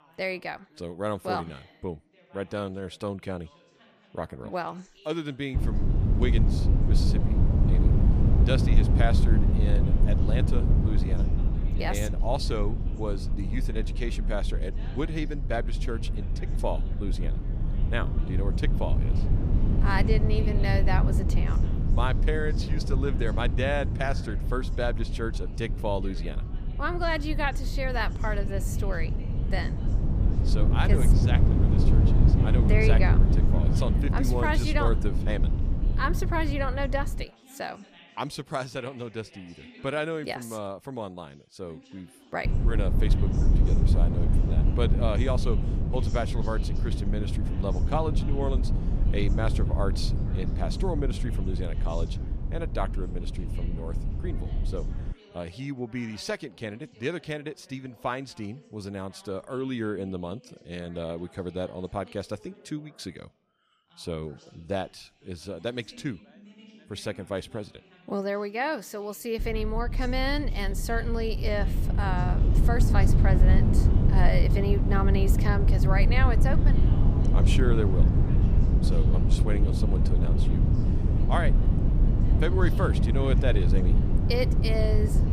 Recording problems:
low rumble; loud; from 5.5 to 37 s, from 42 to 55 s and from 1:09 on; 5 dB below the speech
background chatter; faint; throughout; 2 voices, 20 dB below the speech

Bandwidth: 15 kHz